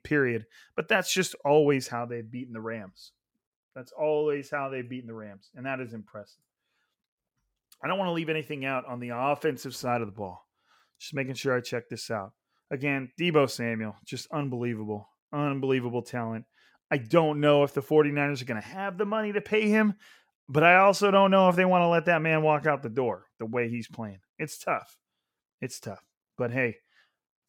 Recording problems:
none

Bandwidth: 17 kHz